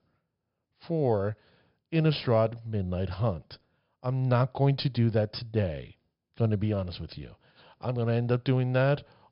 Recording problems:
high frequencies cut off; noticeable; nothing above 5.5 kHz

